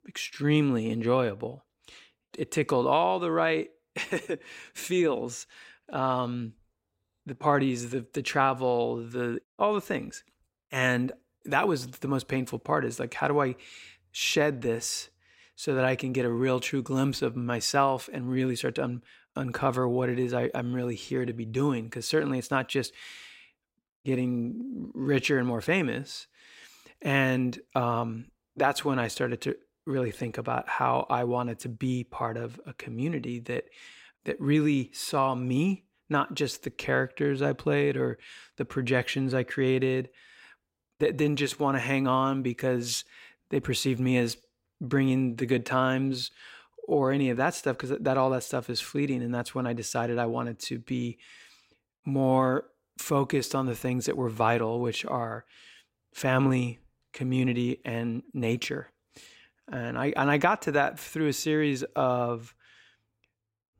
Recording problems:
none

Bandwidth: 16 kHz